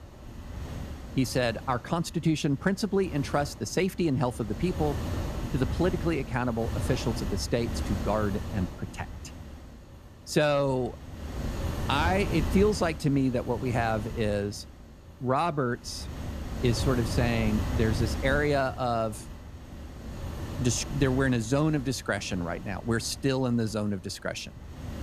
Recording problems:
wind noise on the microphone; occasional gusts; 10 dB below the speech

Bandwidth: 14.5 kHz